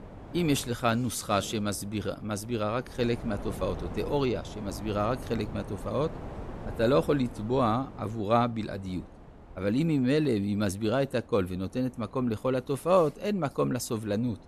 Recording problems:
wind noise on the microphone; occasional gusts; 15 dB below the speech

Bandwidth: 13.5 kHz